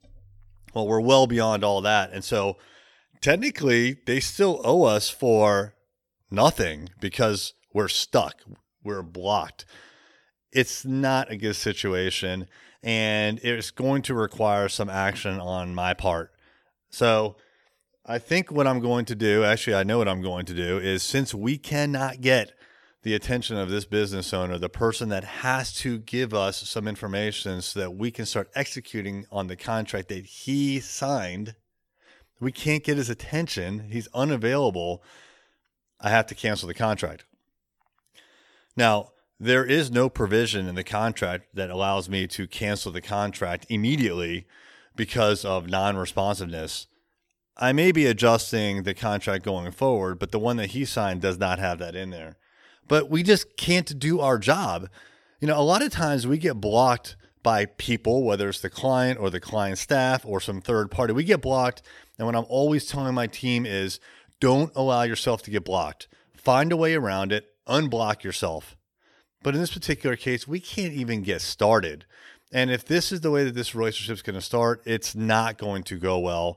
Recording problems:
none

